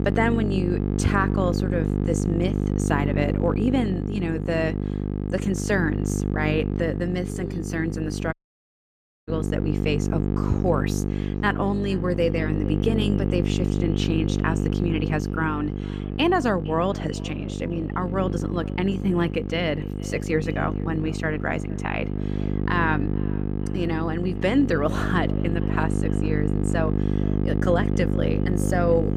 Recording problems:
echo of what is said; faint; from 11 s on; 460 ms later, 25 dB below the speech
electrical hum; loud; throughout; 50 Hz, 6 dB below the speech
audio cutting out; at 8.5 s for 1 s

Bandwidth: 15 kHz